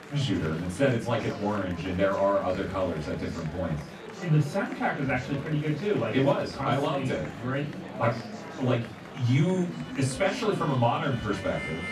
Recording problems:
off-mic speech; far
room echo; slight; dies away in 0.2 s
background music; noticeable; from 7 s on; 15 dB below the speech
chatter from many people; noticeable; throughout; 10 dB below the speech

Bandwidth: 14 kHz